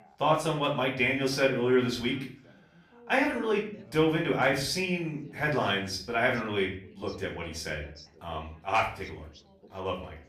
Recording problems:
off-mic speech; far
room echo; slight; dies away in 0.4 s
background chatter; faint; throughout; 3 voices, 25 dB below the speech

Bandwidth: 14.5 kHz